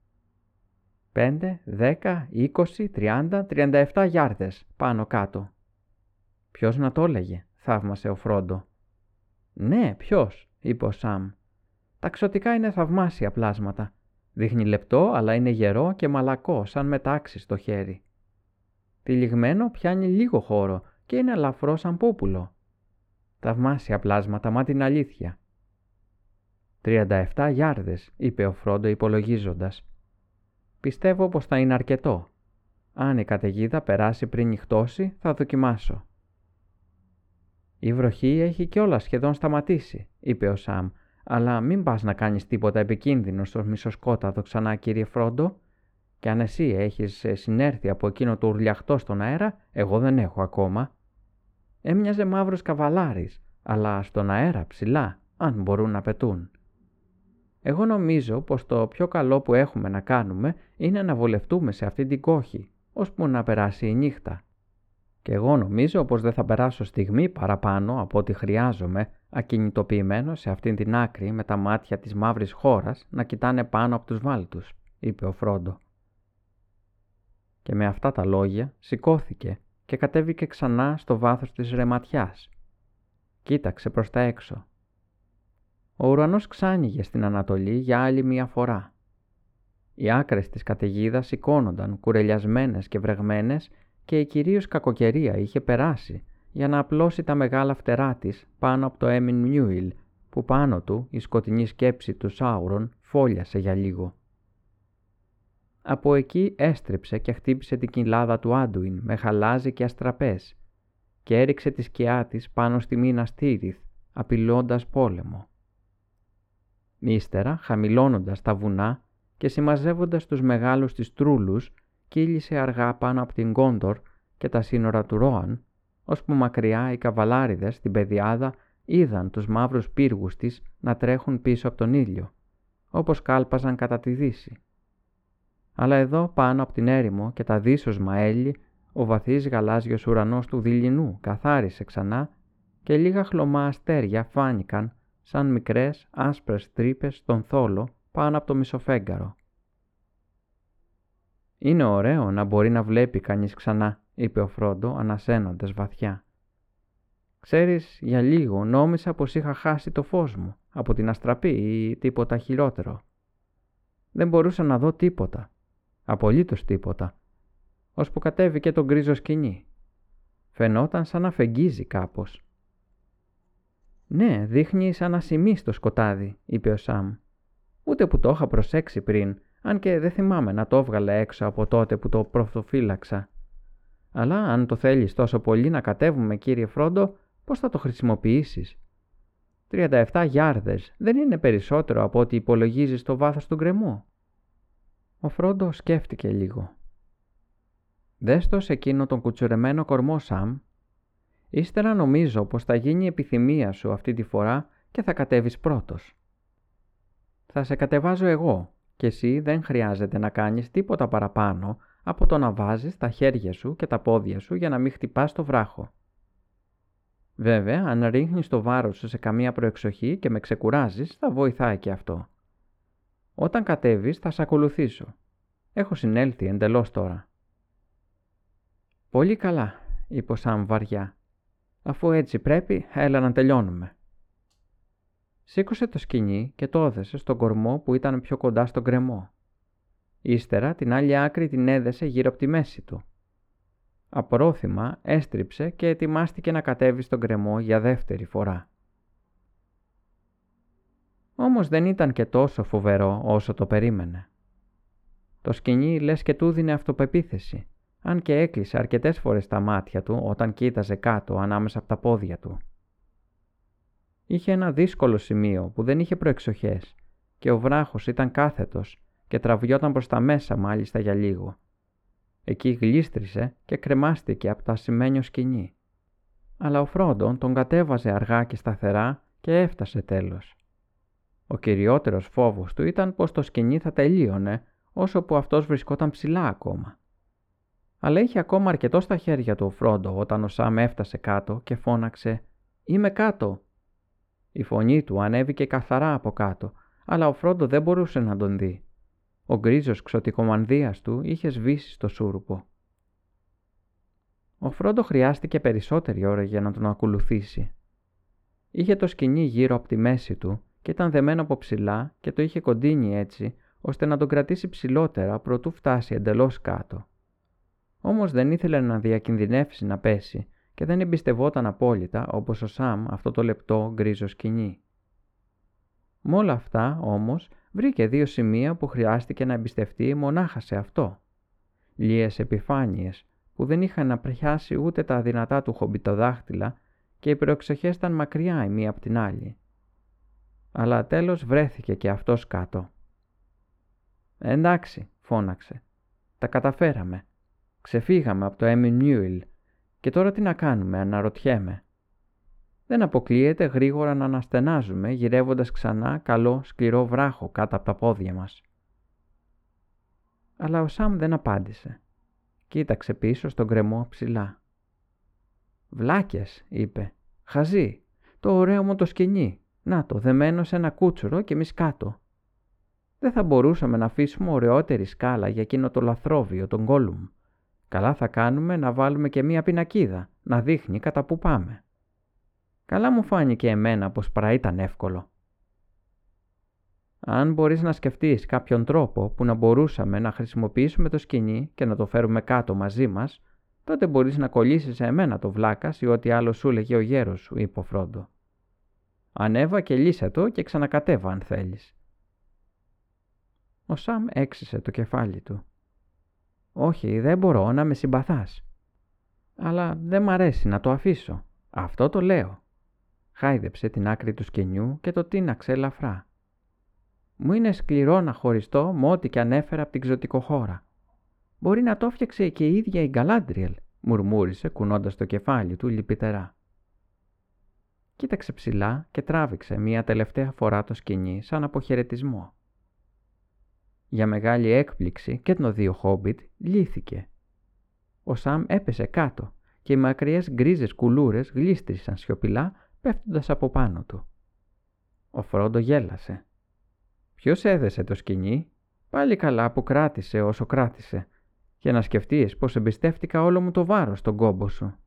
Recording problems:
muffled; very; fading above 3.5 kHz

